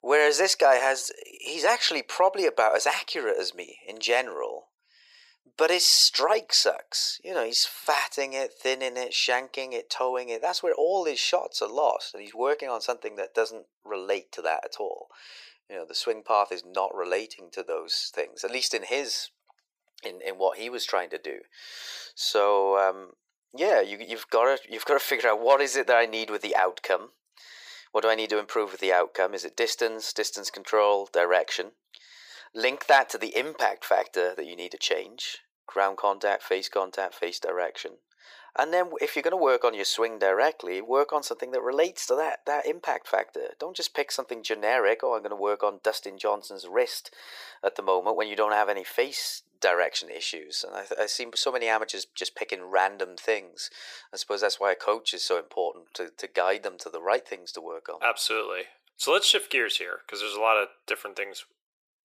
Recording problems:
thin; very; fading below 450 Hz

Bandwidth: 15 kHz